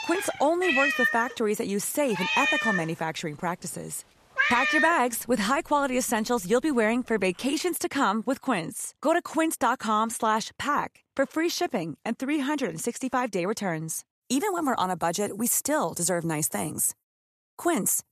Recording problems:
animal sounds; very loud; until 7.5 s; 1 dB above the speech

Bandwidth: 14 kHz